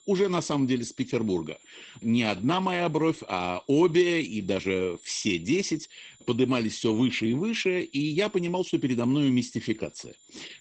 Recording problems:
garbled, watery; badly; nothing above 8 kHz
high-pitched whine; faint; throughout; 7 kHz, 25 dB below the speech

